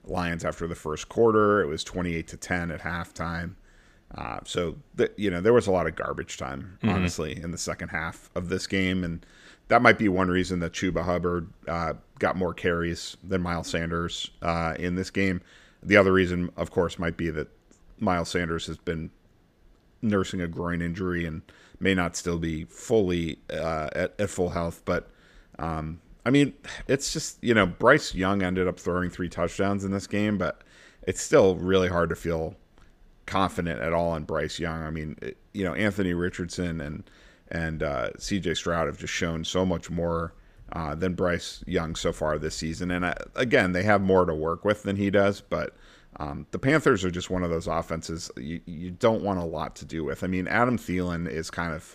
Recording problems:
none

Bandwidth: 15 kHz